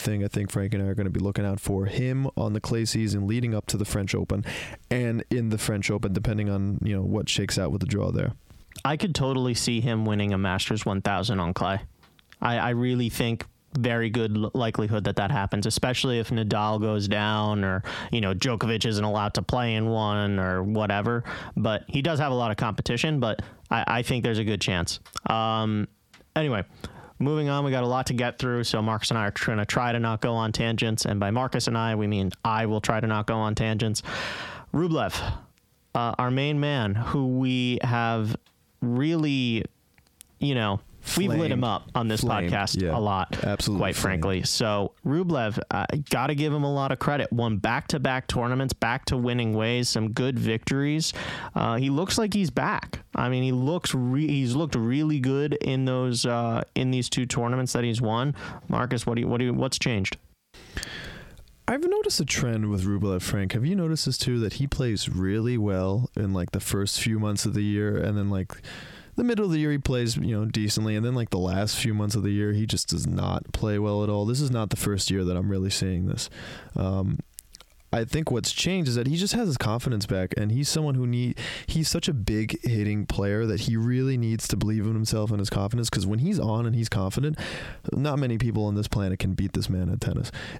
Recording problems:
squashed, flat; heavily

